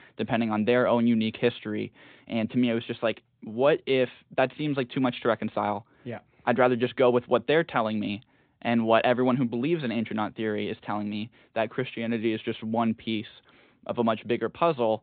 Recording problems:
high frequencies cut off; severe; nothing above 4 kHz

